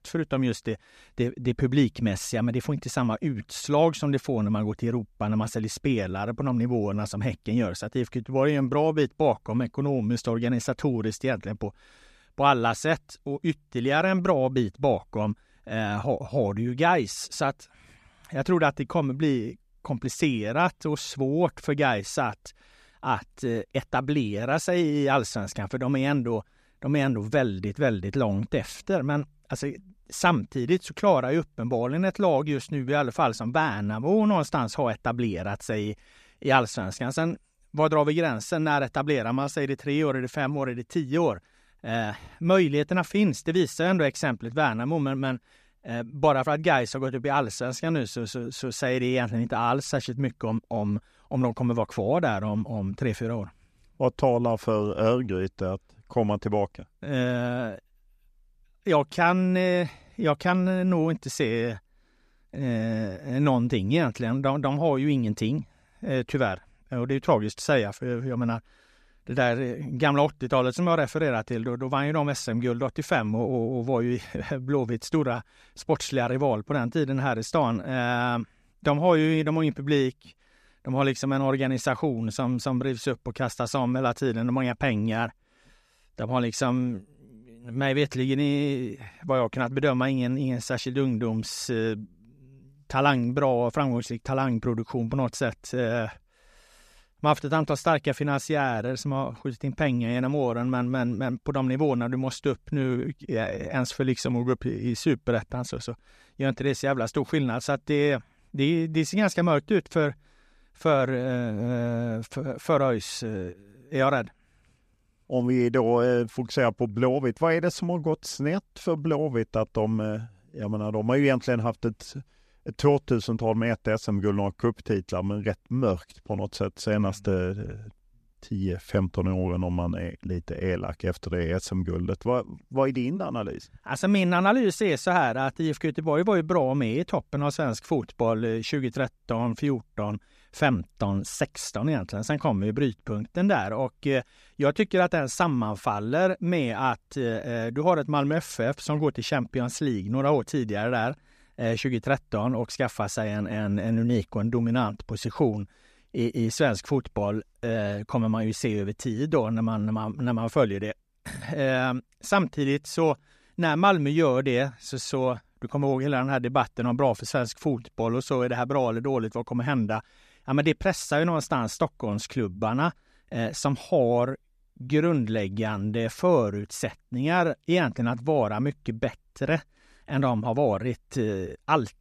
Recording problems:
none

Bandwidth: 14.5 kHz